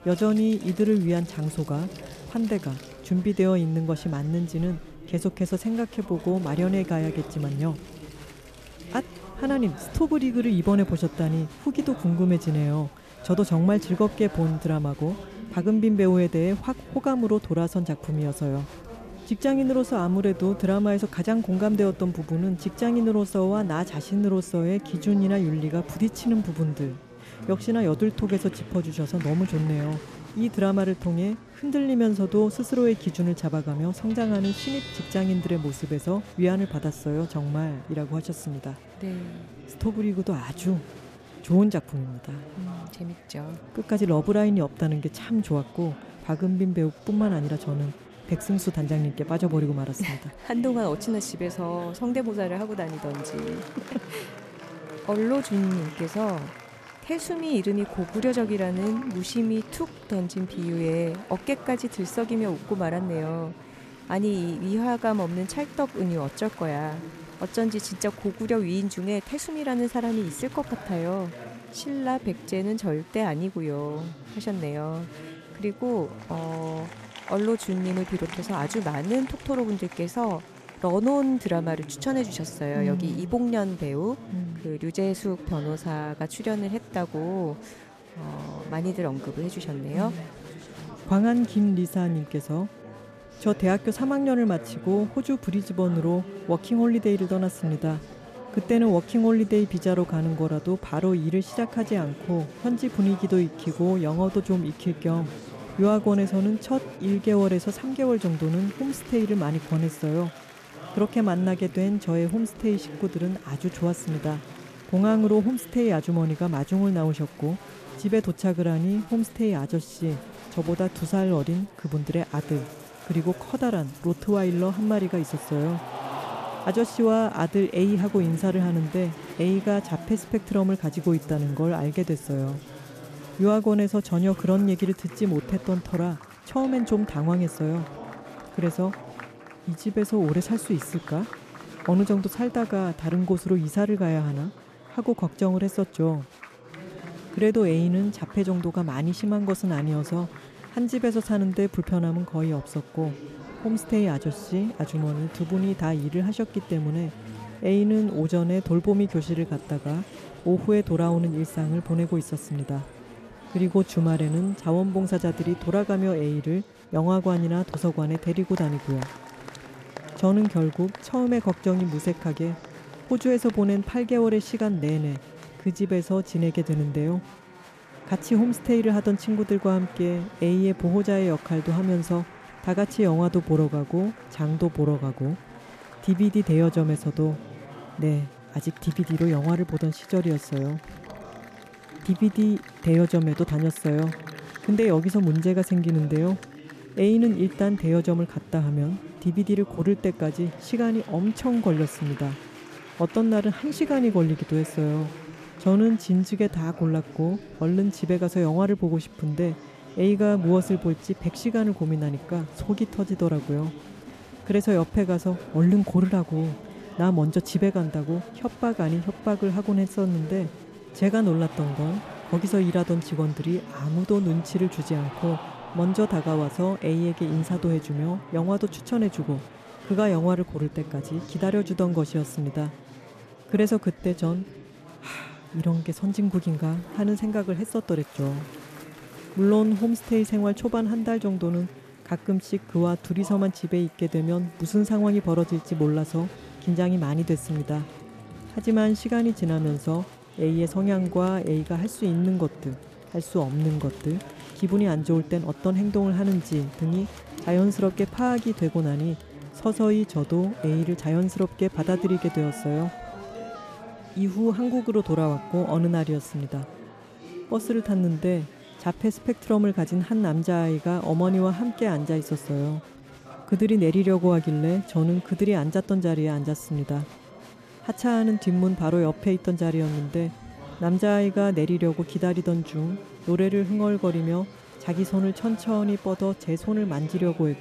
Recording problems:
chatter from many people; noticeable; throughout; 15 dB below the speech
background music; faint; throughout; 30 dB below the speech

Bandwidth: 14.5 kHz